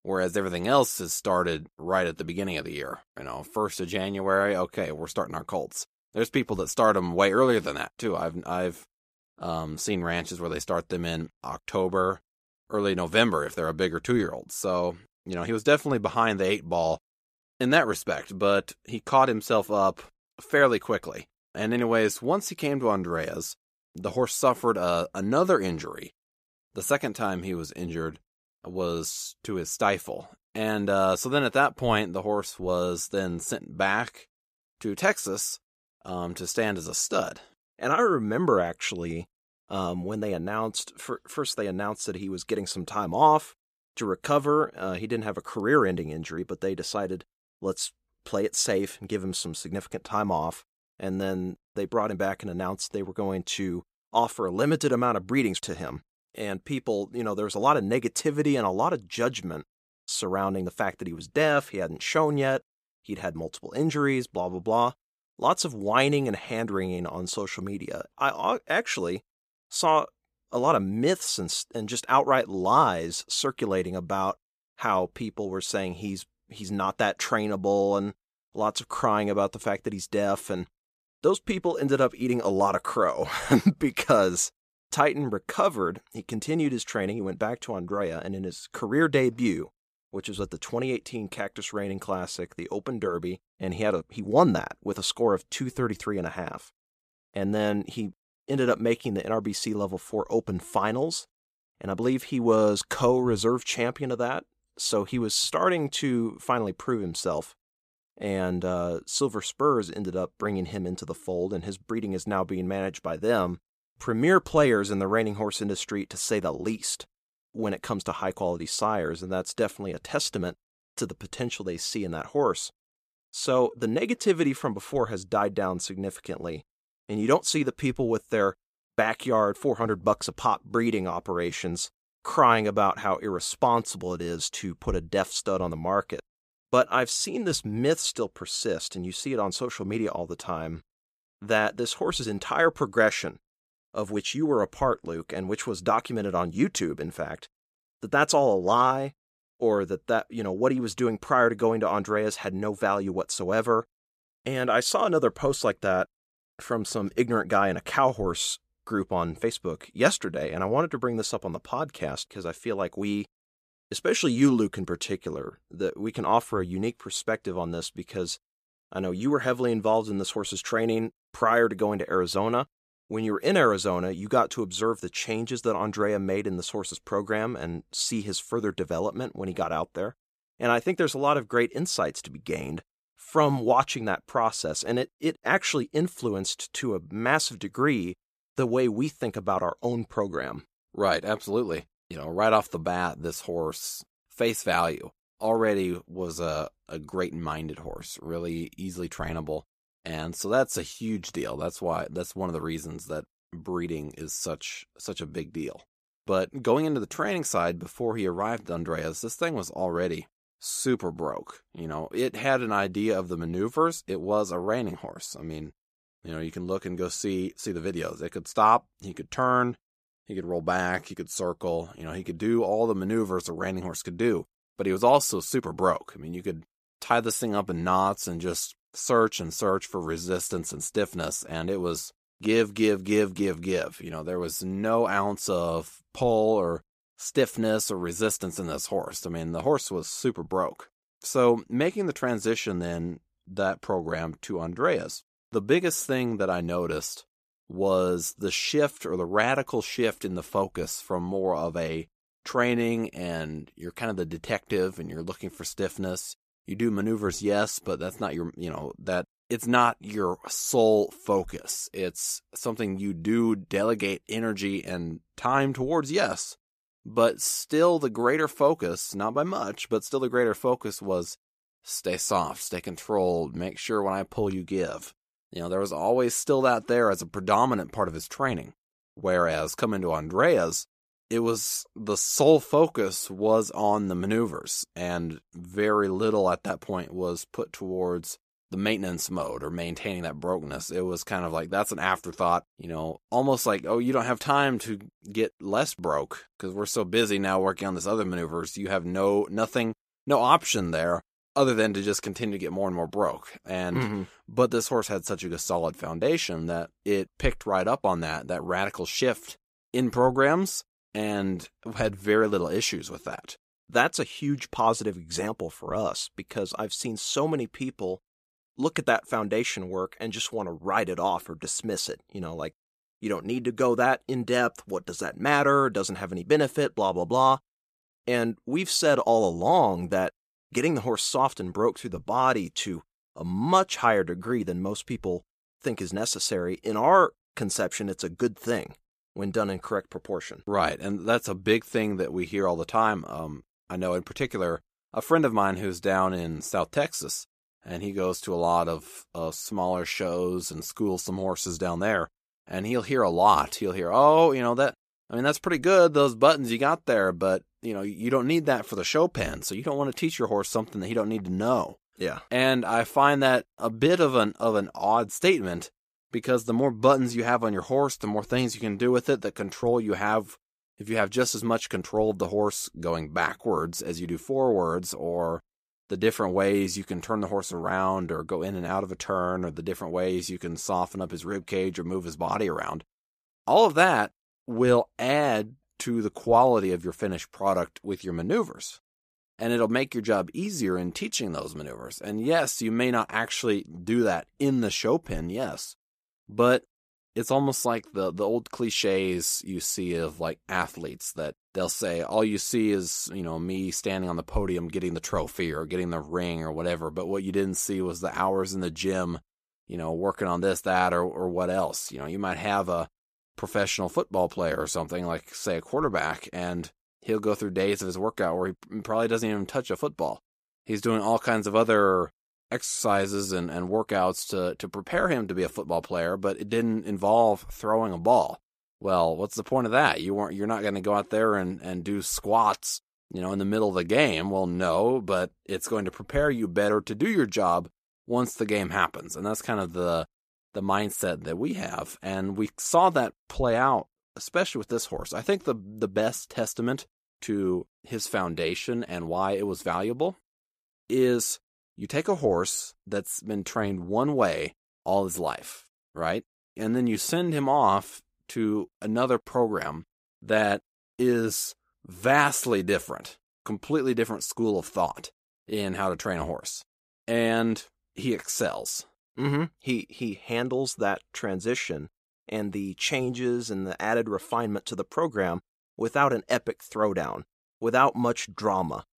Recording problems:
none

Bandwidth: 14.5 kHz